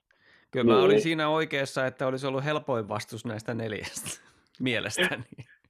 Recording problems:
none

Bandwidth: 14.5 kHz